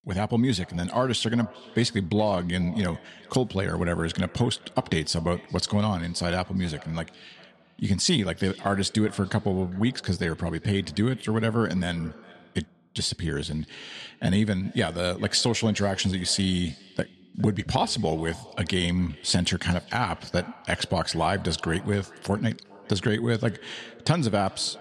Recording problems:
echo of what is said; faint; throughout; 410 ms later, 20 dB below the speech

